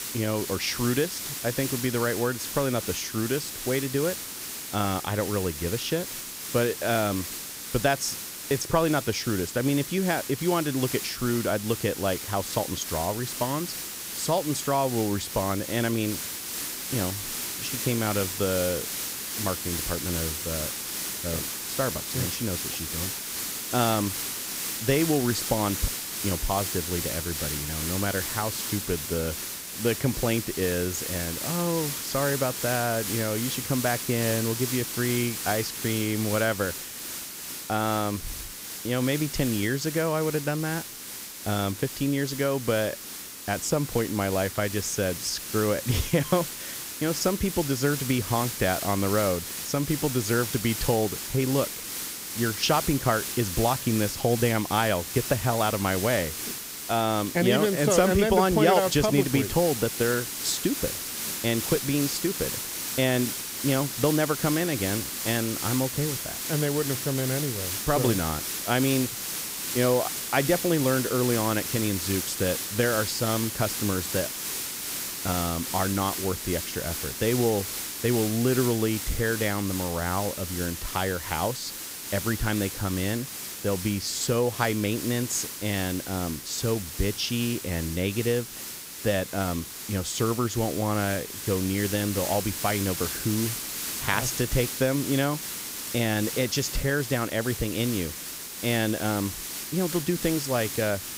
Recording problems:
hiss; loud; throughout; 4 dB below the speech

